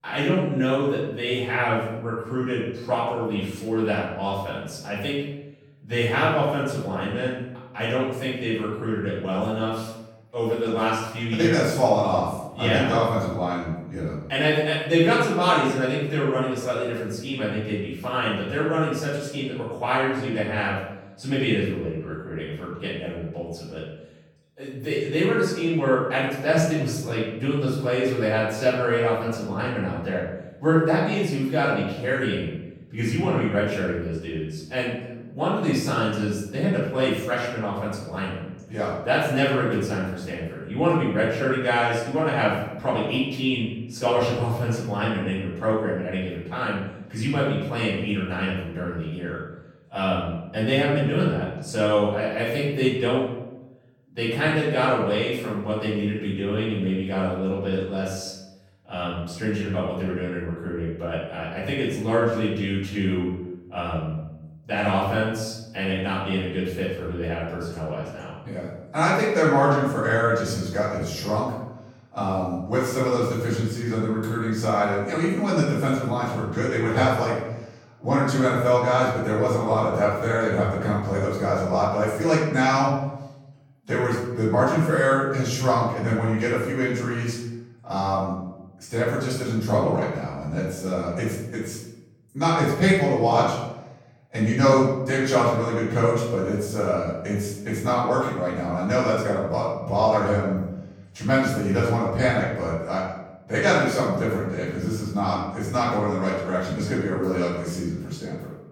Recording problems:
off-mic speech; far
room echo; noticeable; dies away in 0.8 s

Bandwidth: 17 kHz